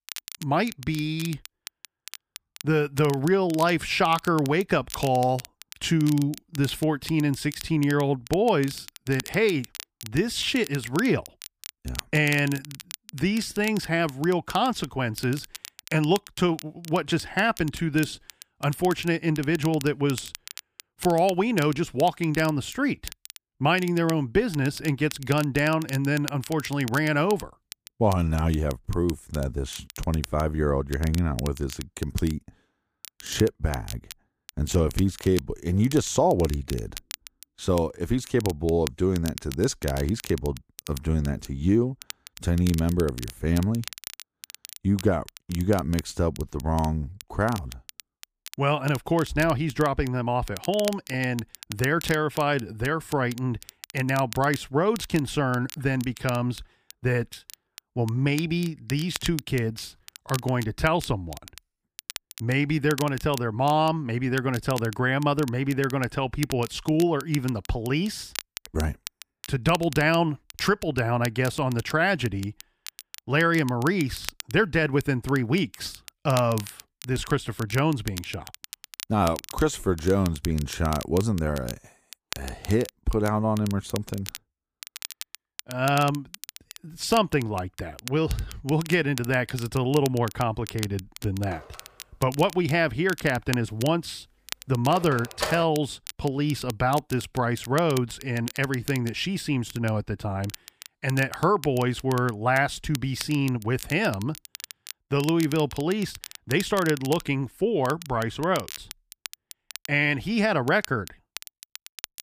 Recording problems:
crackle, like an old record; noticeable; 15 dB below the speech
phone ringing; noticeable; from 1:31 to 1:36; peak 5 dB below the speech

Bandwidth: 15 kHz